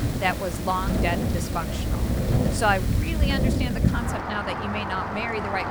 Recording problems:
rain or running water; very loud; throughout; 2 dB above the speech

